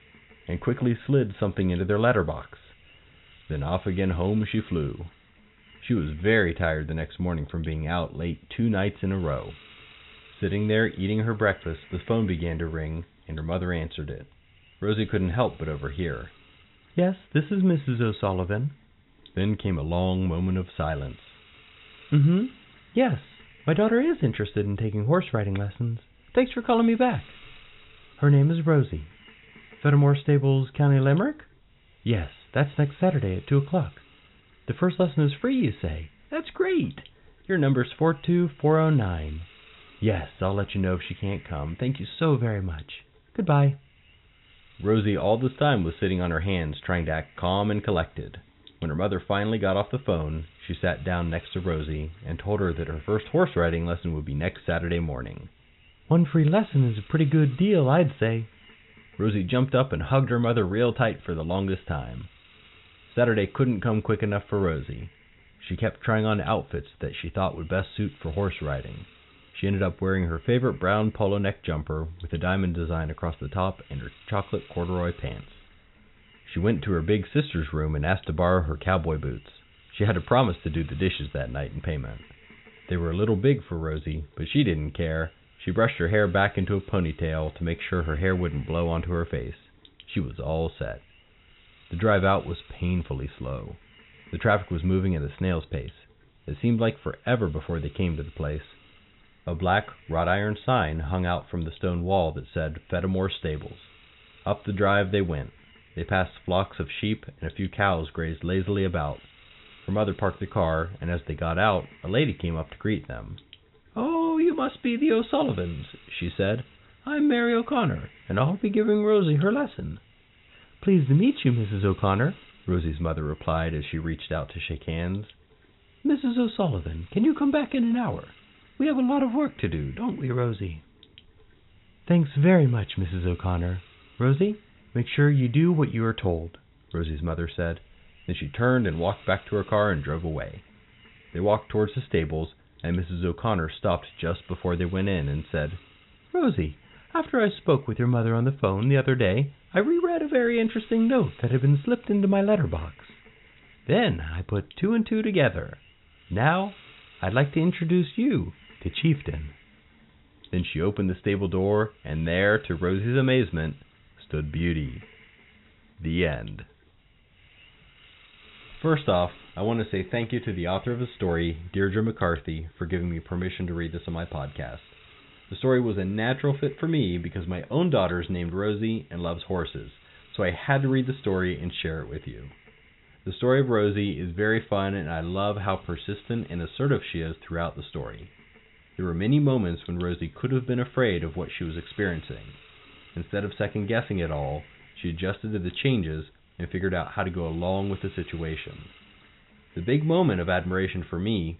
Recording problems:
high frequencies cut off; severe; nothing above 4 kHz
hiss; faint; throughout; 25 dB below the speech

